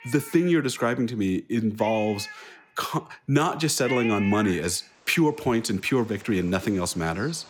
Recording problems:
animal sounds; noticeable; throughout; 10 dB below the speech

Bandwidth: 18 kHz